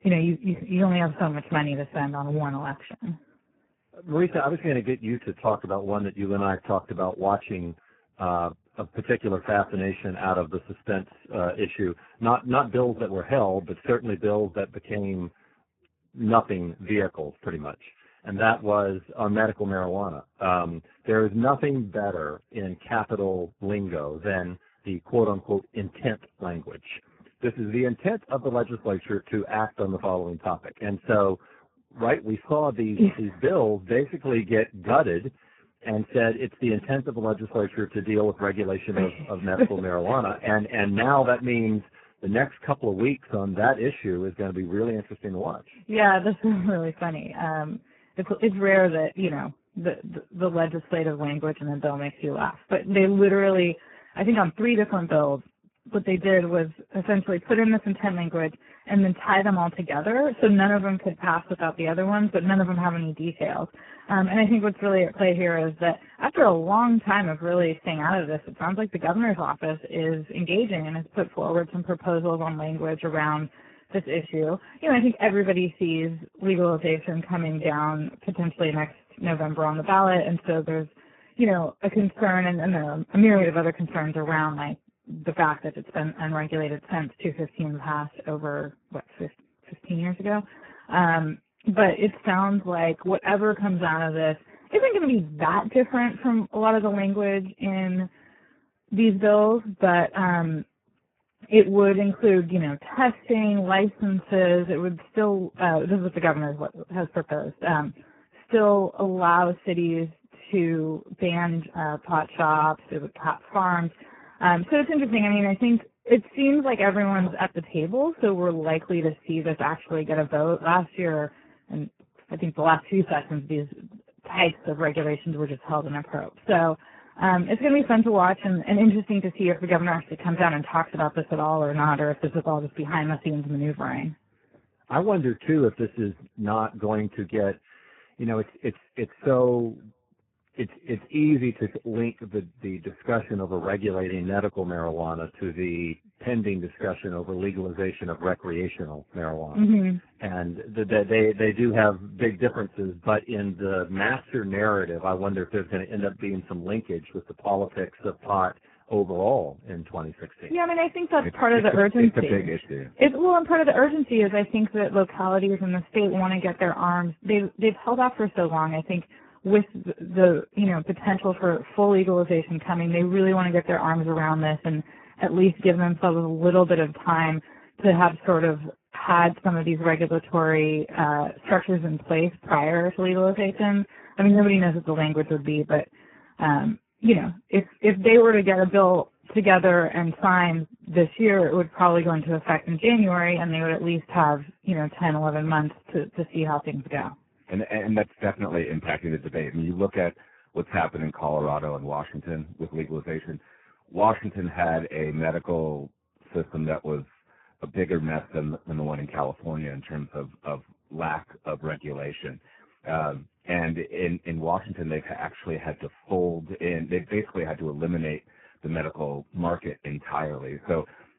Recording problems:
garbled, watery; badly

